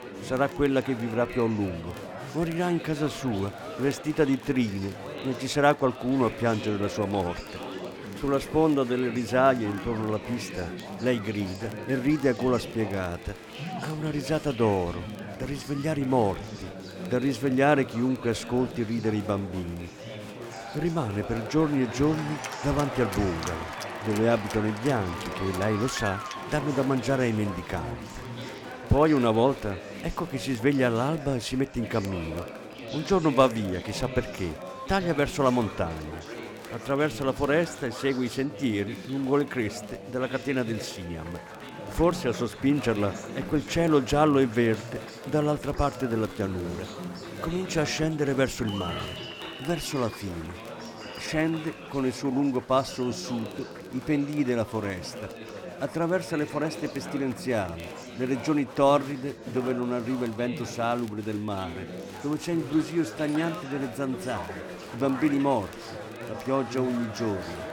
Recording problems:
chatter from many people; noticeable; throughout; 10 dB below the speech
crackle, like an old record; faint; 30 dB below the speech

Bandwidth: 17.5 kHz